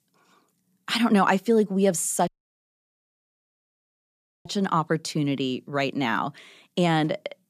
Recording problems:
audio cutting out; at 2.5 s for 2 s

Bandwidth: 14.5 kHz